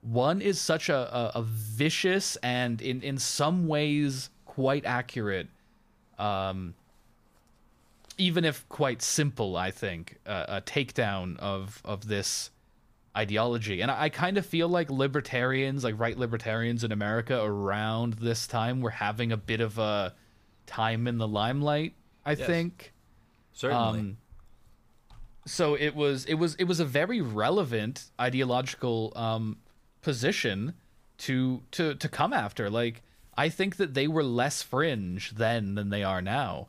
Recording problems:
none

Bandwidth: 15 kHz